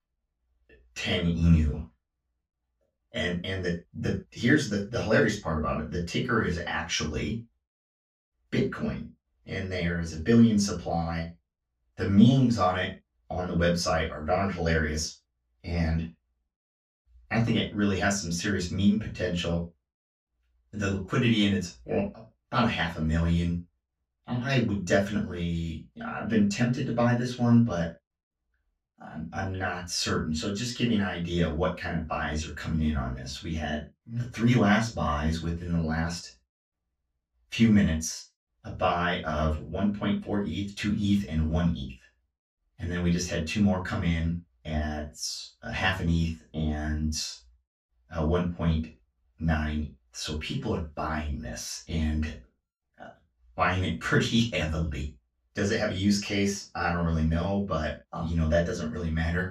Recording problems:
off-mic speech; far
room echo; slight; dies away in 0.2 s

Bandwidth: 15.5 kHz